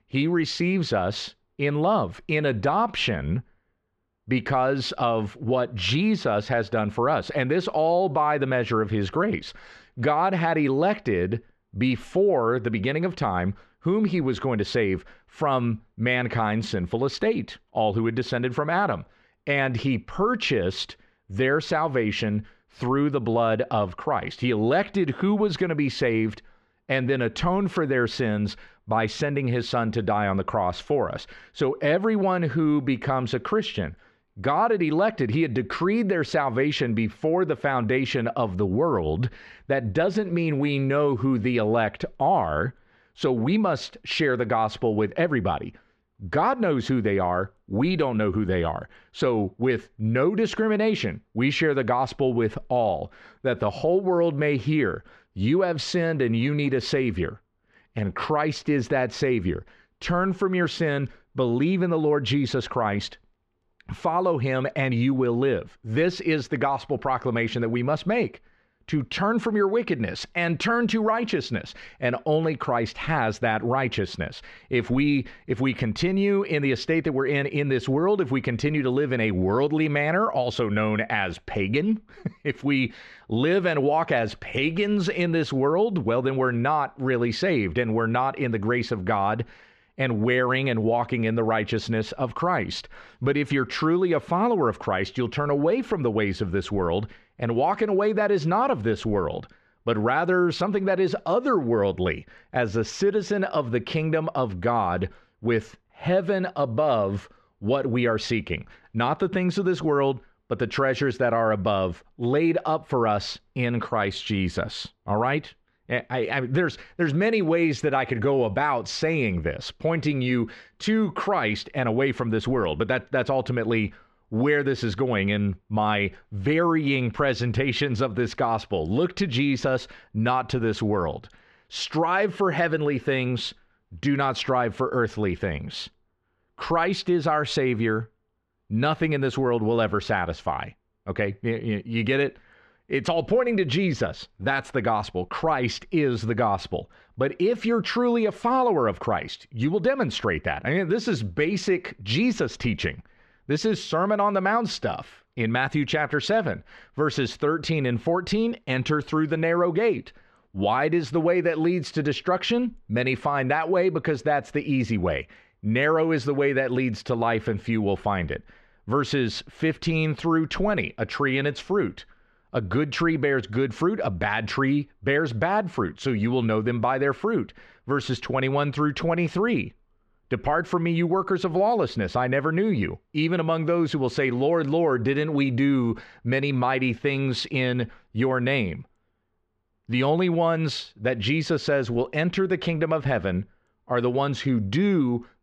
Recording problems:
muffled; slightly; fading above 4 kHz

